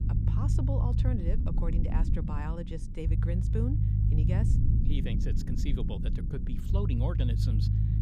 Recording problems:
low rumble; loud; throughout; 1 dB below the speech

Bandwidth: 15.5 kHz